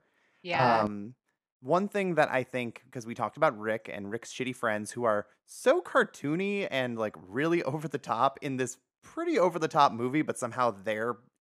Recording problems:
none

